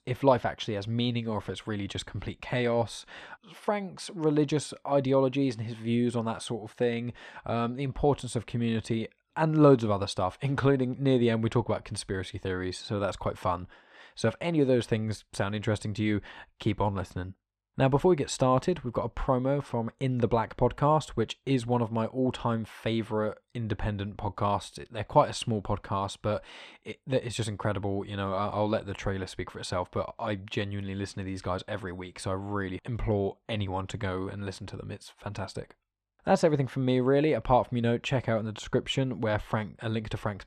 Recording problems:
muffled; slightly; fading above 4 kHz

